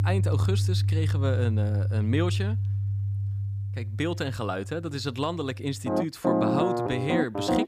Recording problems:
background music; very loud; throughout; 4 dB above the speech

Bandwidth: 15 kHz